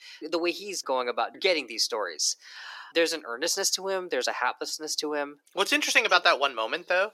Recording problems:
thin; somewhat; fading below 350 Hz

